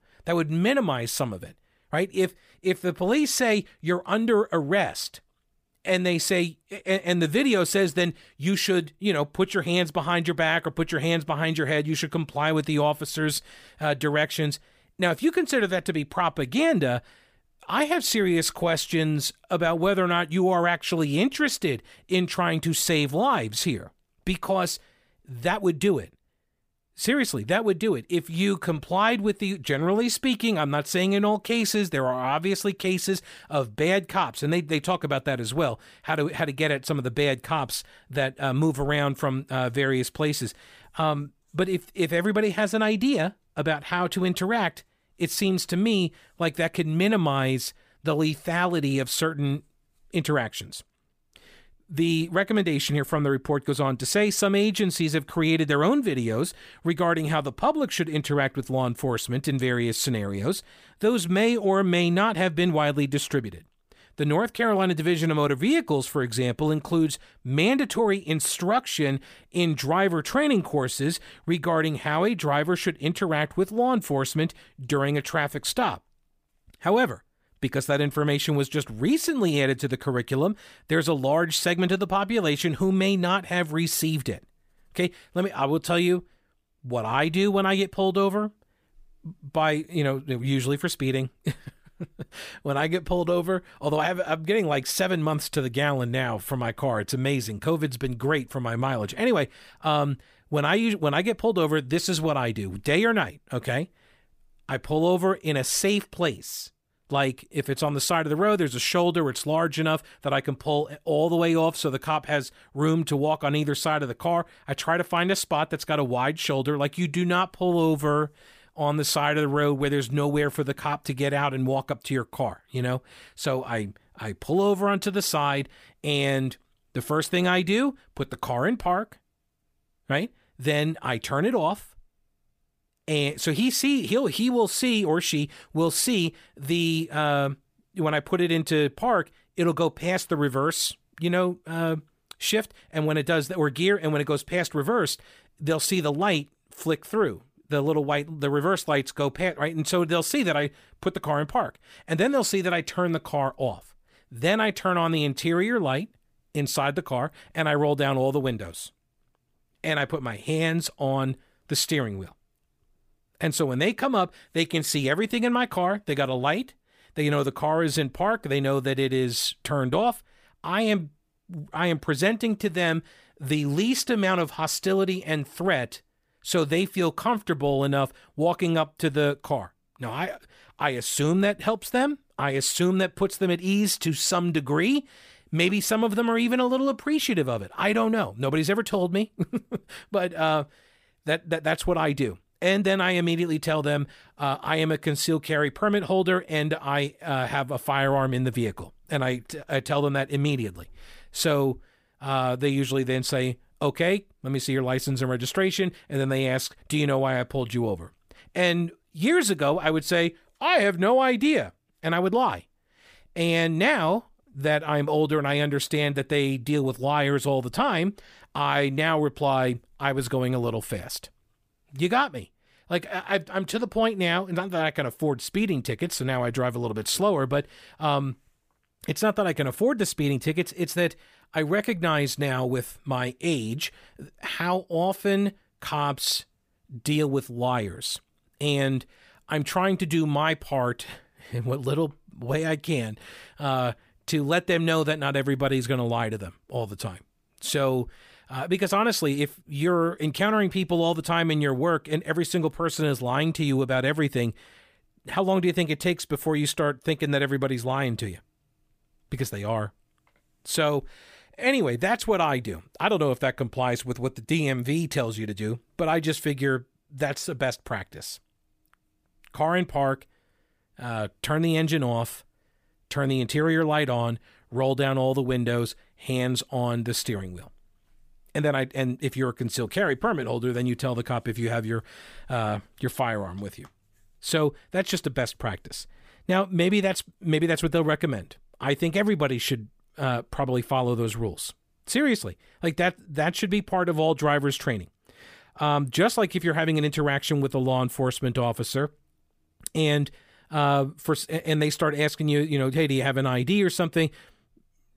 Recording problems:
none

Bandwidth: 15 kHz